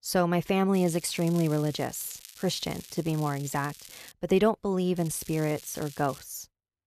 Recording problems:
crackling; noticeable; from 0.5 to 4 s and from 5 to 6 s; 15 dB below the speech

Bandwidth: 14.5 kHz